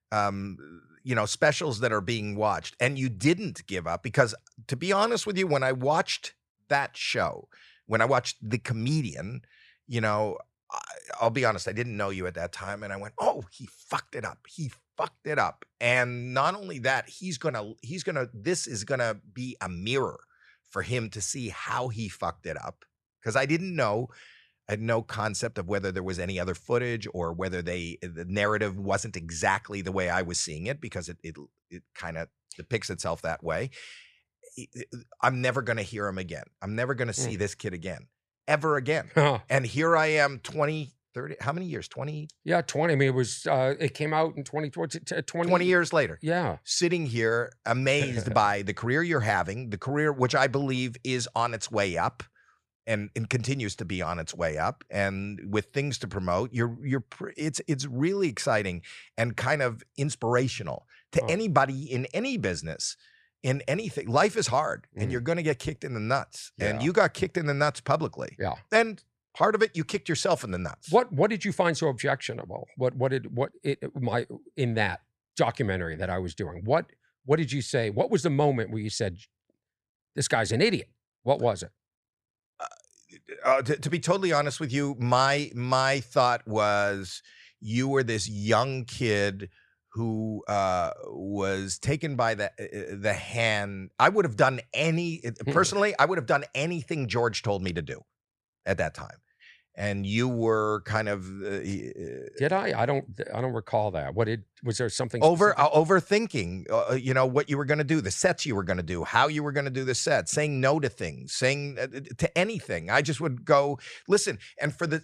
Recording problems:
none

